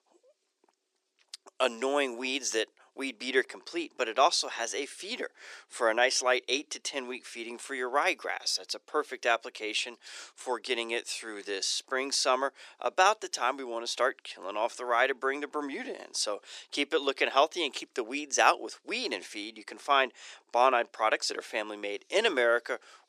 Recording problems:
thin; very; fading below 350 Hz

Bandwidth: 14.5 kHz